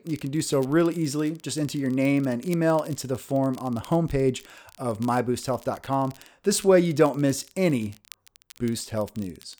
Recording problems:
crackle, like an old record; faint; 25 dB below the speech

